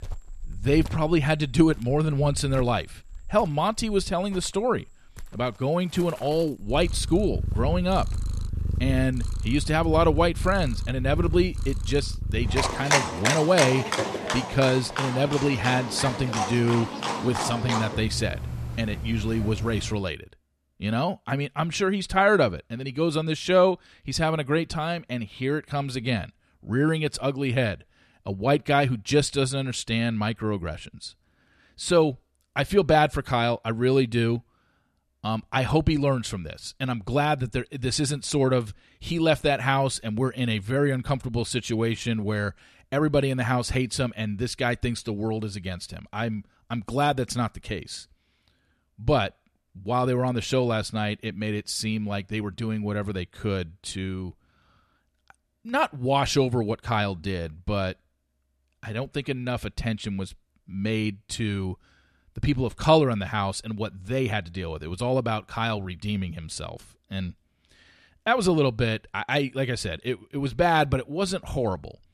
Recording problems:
animal sounds; loud; until 20 s; 4 dB below the speech

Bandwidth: 13.5 kHz